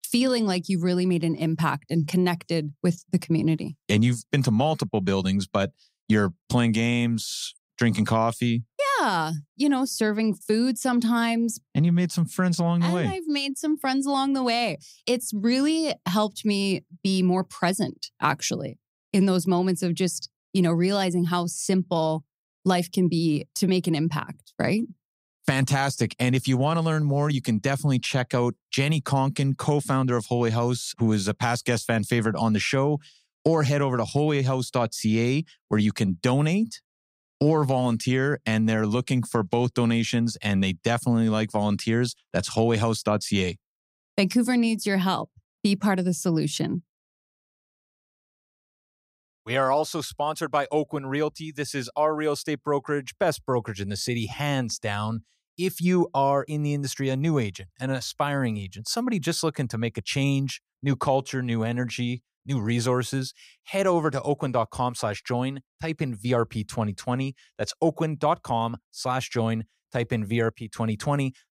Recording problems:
none

